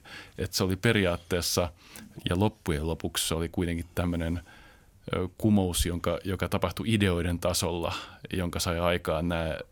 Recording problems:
none

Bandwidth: 17 kHz